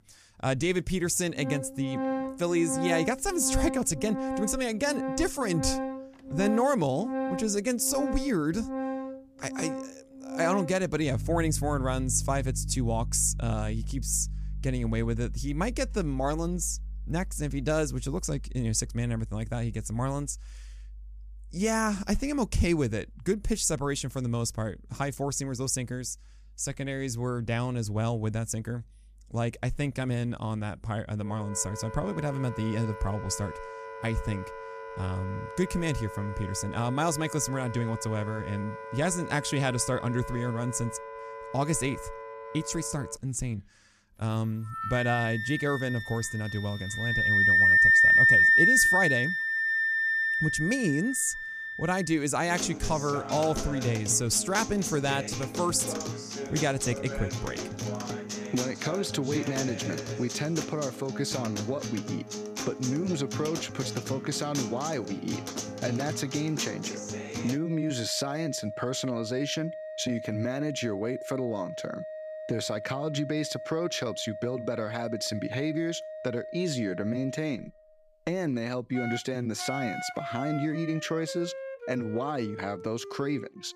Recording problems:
background music; loud; throughout; as loud as the speech

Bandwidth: 14.5 kHz